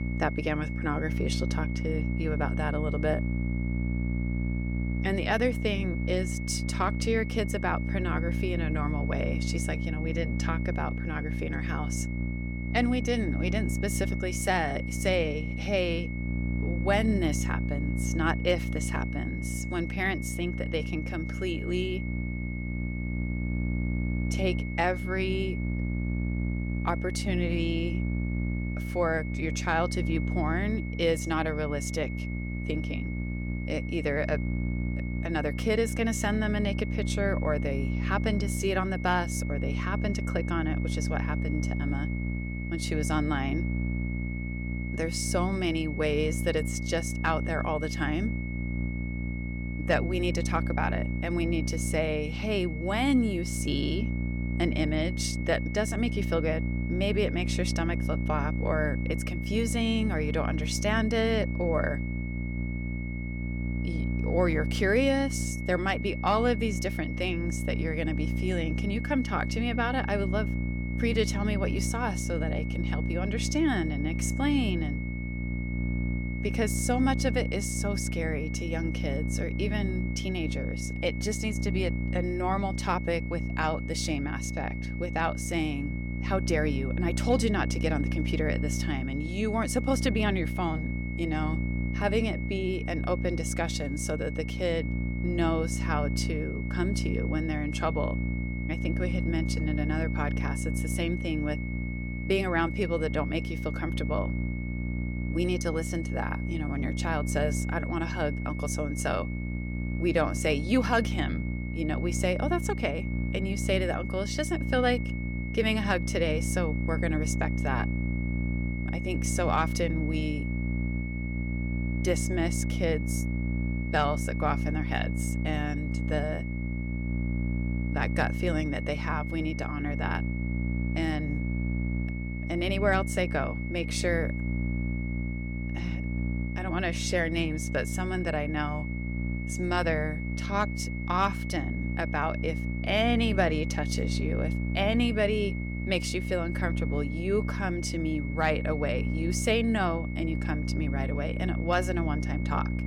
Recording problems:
electrical hum; noticeable; throughout; 60 Hz, 10 dB below the speech
high-pitched whine; noticeable; throughout; 2 kHz, 10 dB below the speech

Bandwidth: 17.5 kHz